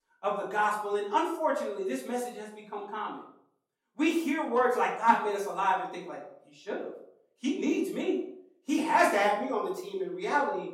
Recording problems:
off-mic speech; far
room echo; slight; dies away in 0.5 s

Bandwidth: 16.5 kHz